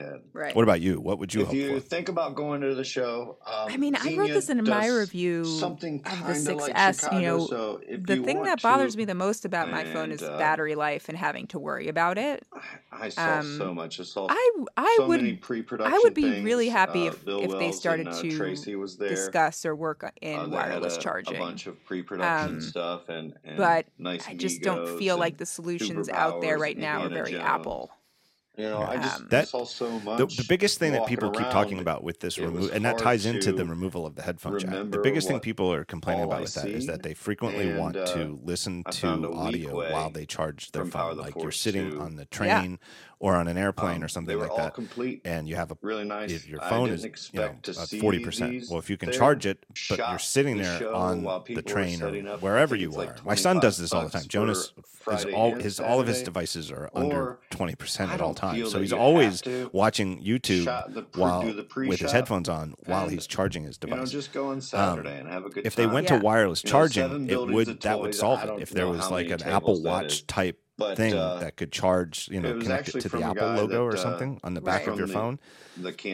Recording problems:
voice in the background; loud; throughout; 5 dB below the speech

